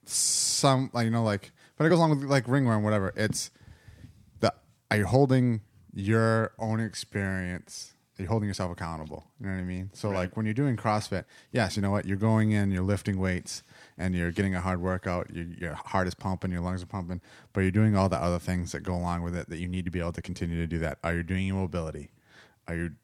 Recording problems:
uneven, jittery; strongly; from 2 to 20 s

